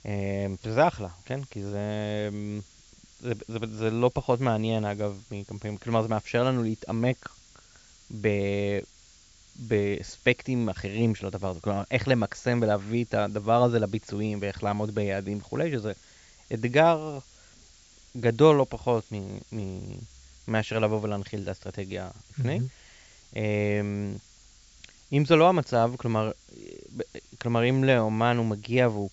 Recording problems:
high frequencies cut off; noticeable; nothing above 8 kHz
hiss; faint; throughout; 25 dB below the speech

